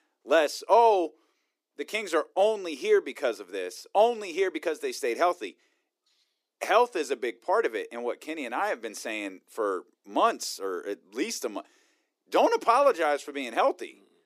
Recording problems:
thin; very; fading below 300 Hz

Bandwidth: 15 kHz